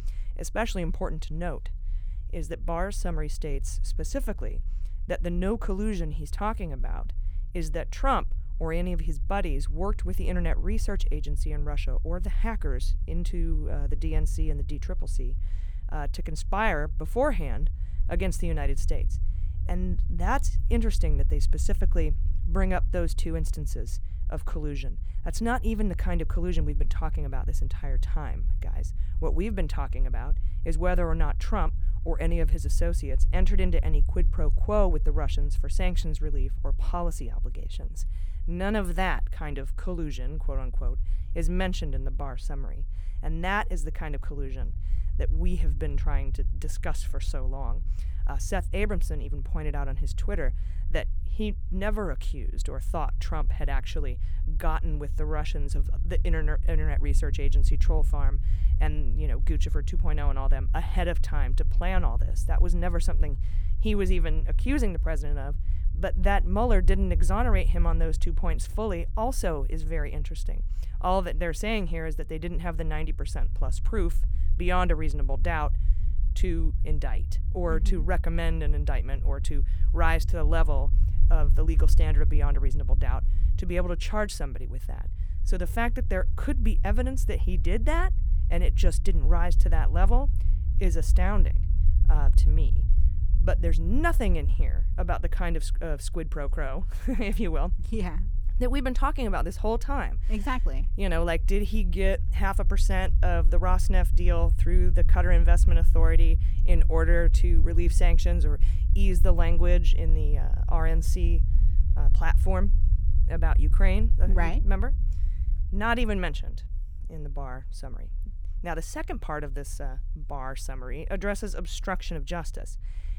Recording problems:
low rumble; noticeable; throughout; 15 dB below the speech

